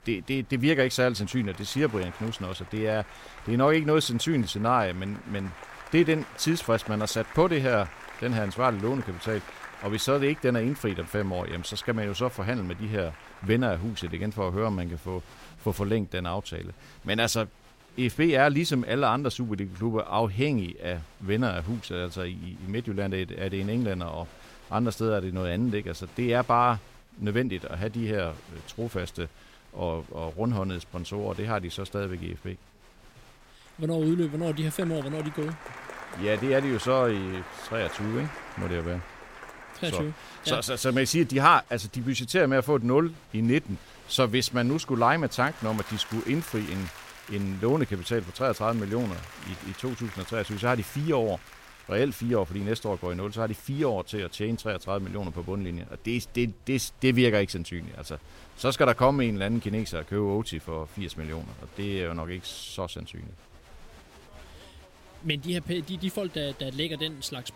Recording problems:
crowd noise; noticeable; throughout; 20 dB below the speech

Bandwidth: 16 kHz